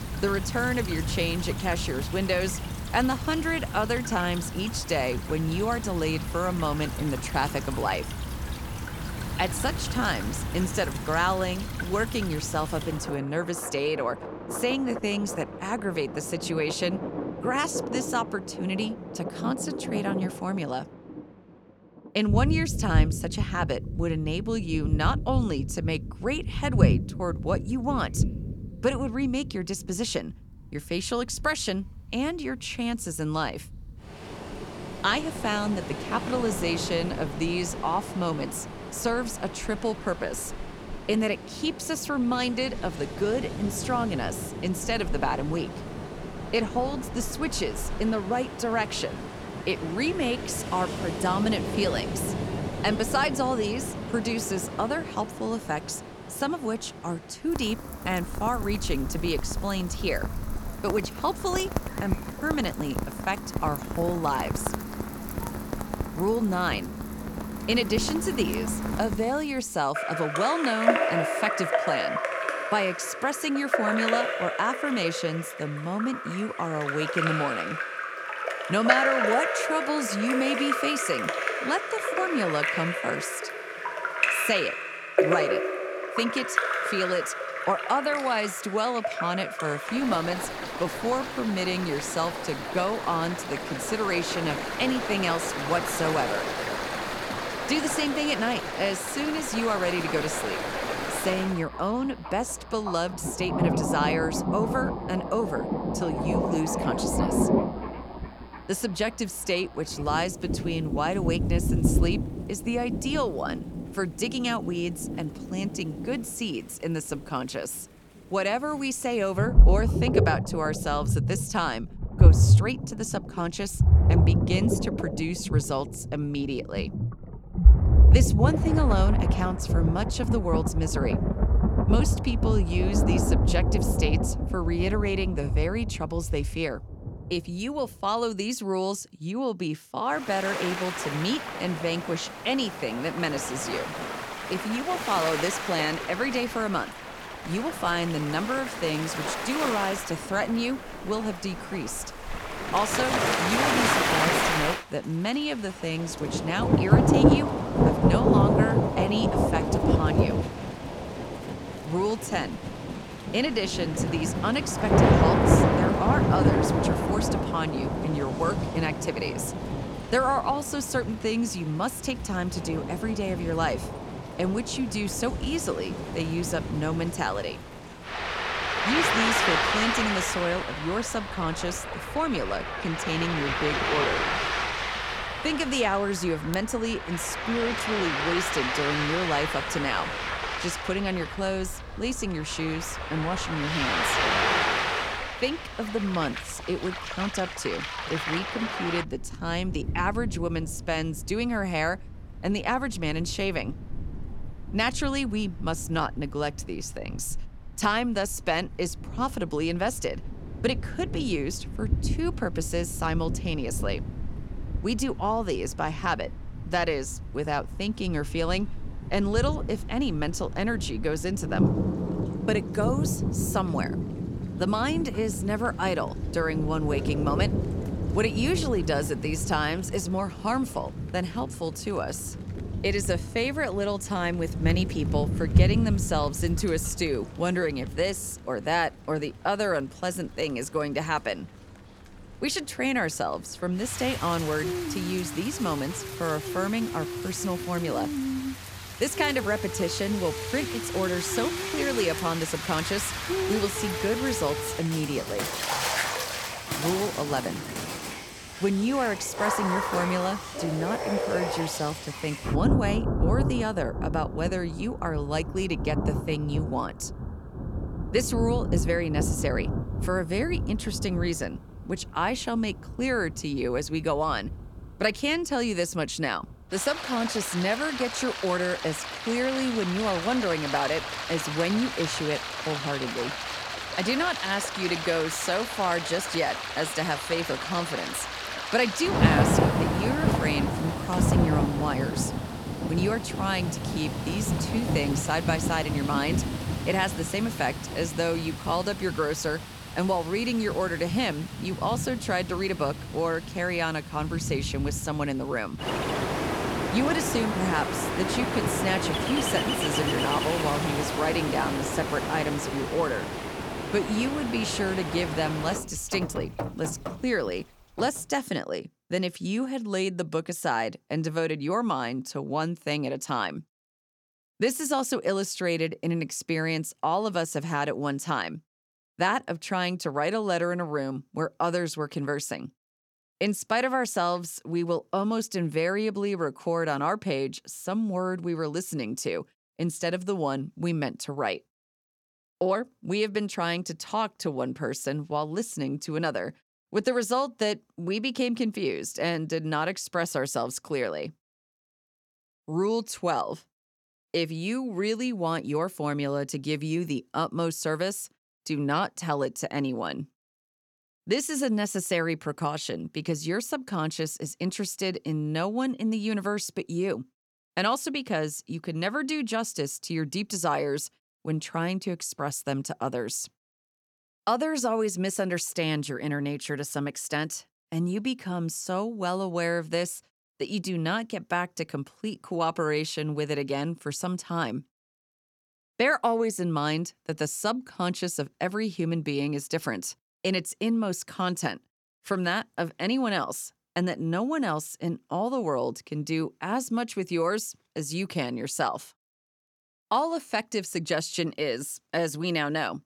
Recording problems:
rain or running water; loud; until 5:18; as loud as the speech

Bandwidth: 18.5 kHz